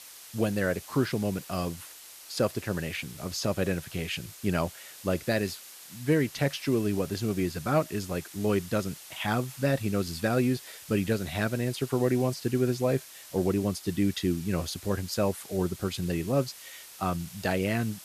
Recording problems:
hiss; noticeable; throughout; 15 dB below the speech

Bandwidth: 14.5 kHz